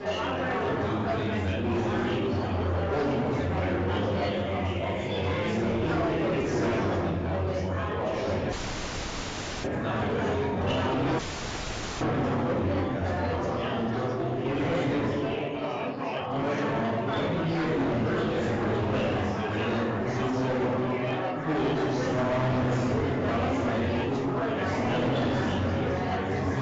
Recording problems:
room echo; strong; dies away in 1.1 s
off-mic speech; far
garbled, watery; badly; nothing above 7.5 kHz
distortion; slight; 19% of the sound clipped
chatter from many people; very loud; throughout; 3 dB above the speech
audio cutting out; at 8.5 s for 1 s and at 11 s for 1 s

